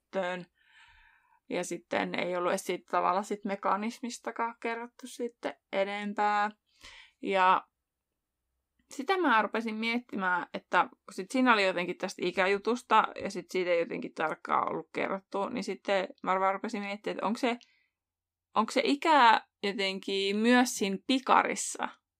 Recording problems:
none

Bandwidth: 15.5 kHz